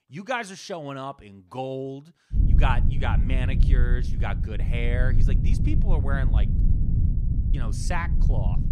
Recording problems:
low rumble; loud; from 2.5 s on; 7 dB below the speech

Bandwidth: 15 kHz